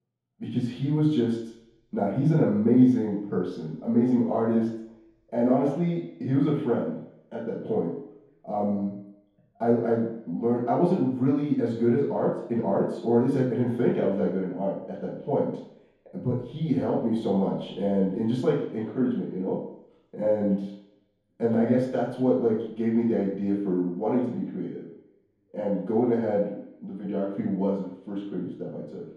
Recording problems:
room echo; strong; dies away in 3 s
off-mic speech; far

